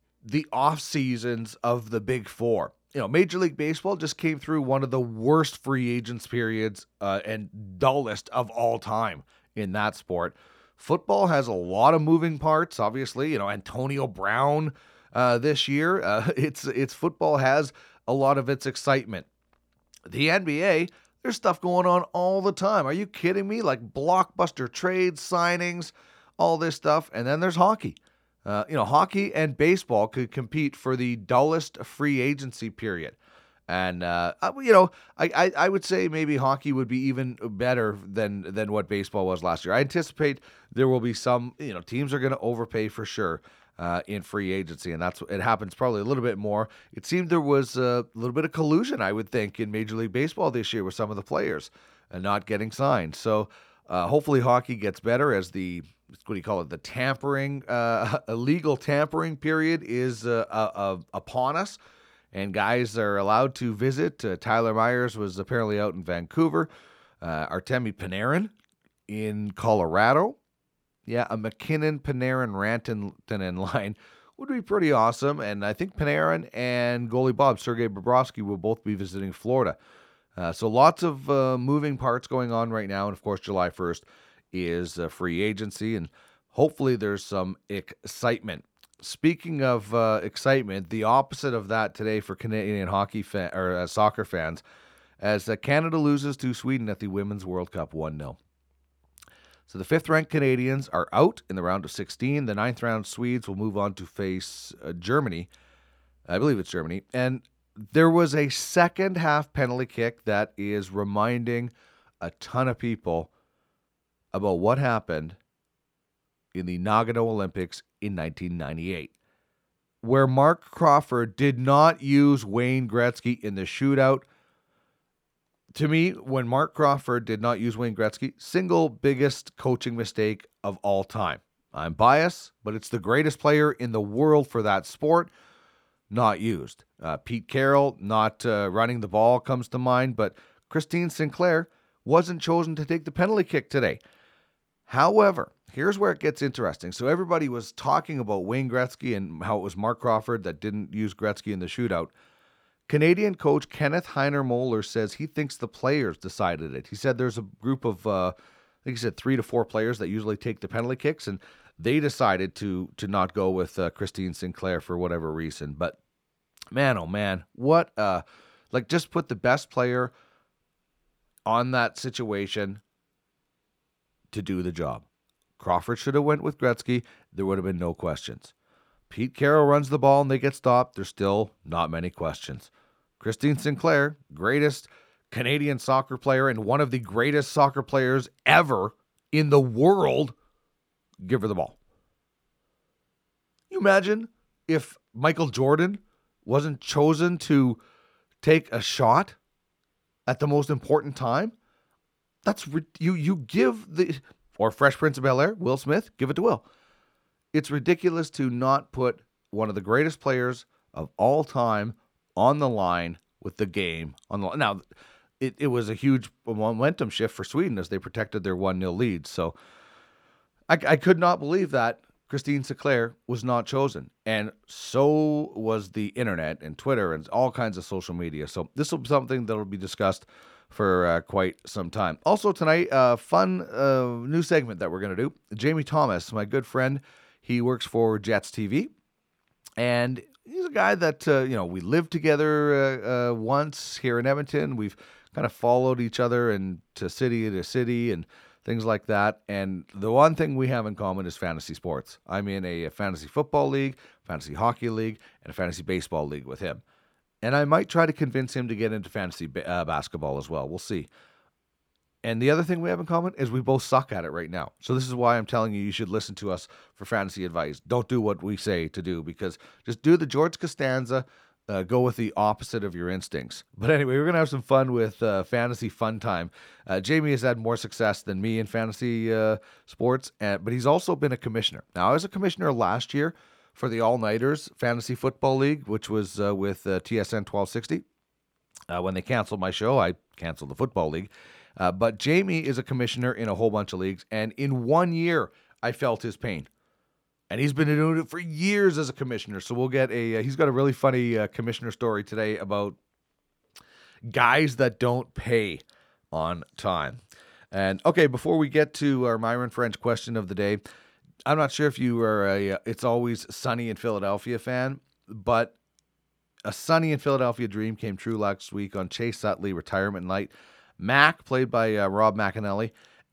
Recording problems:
none

